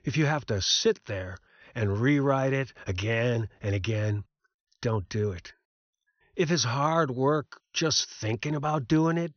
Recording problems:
high frequencies cut off; noticeable; nothing above 6 kHz

